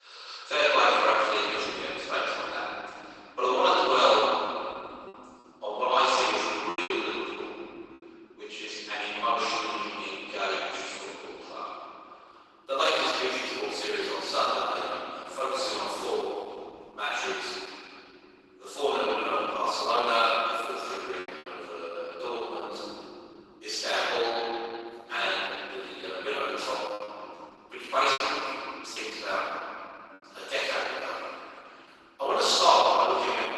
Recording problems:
room echo; strong; dies away in 3 s
off-mic speech; far
garbled, watery; badly; nothing above 12 kHz
thin; very; fading below 400 Hz
choppy; very; from 4 to 7 s, at 21 s and from 27 to 29 s; 8% of the speech affected

